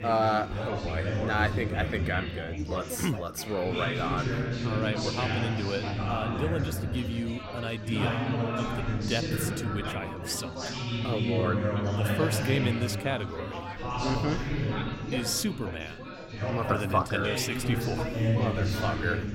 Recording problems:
chatter from many people; very loud; throughout; 1 dB above the speech

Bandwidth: 16 kHz